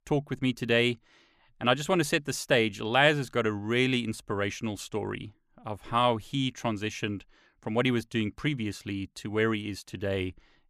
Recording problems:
none

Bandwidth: 14.5 kHz